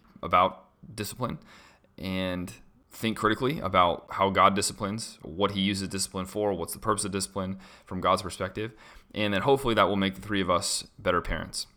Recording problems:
none

